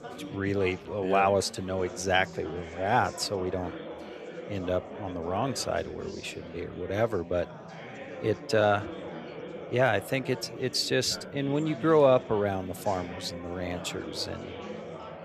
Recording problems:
chatter from many people; noticeable; throughout; 15 dB below the speech

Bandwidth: 13.5 kHz